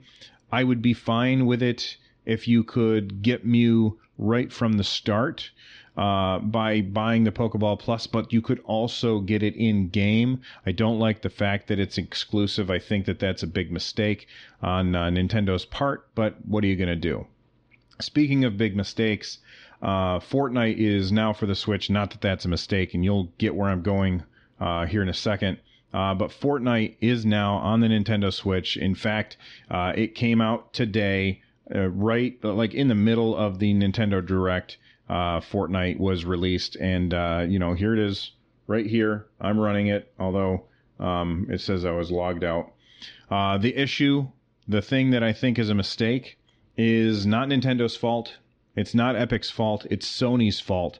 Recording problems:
muffled; very slightly; fading above 4.5 kHz

